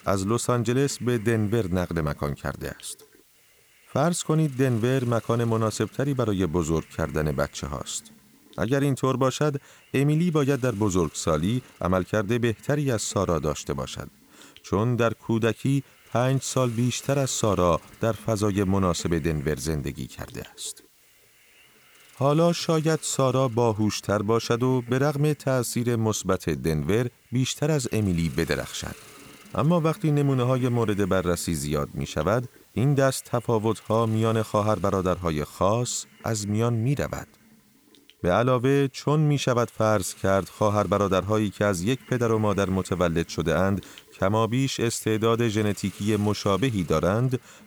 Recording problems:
hiss; faint; throughout; 25 dB below the speech

